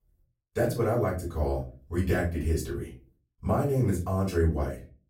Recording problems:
off-mic speech; far
room echo; slight; dies away in 0.3 s

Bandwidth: 16 kHz